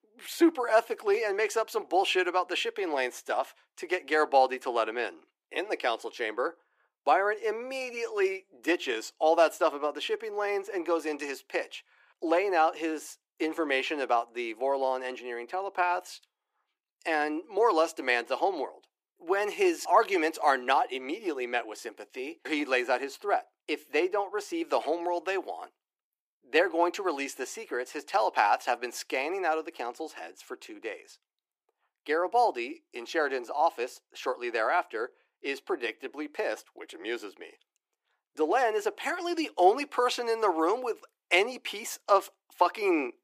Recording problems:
thin; very; fading below 300 Hz

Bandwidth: 15 kHz